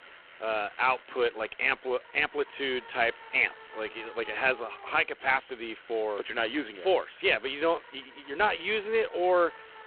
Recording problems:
phone-call audio; poor line
traffic noise; faint; throughout; 20 dB below the speech

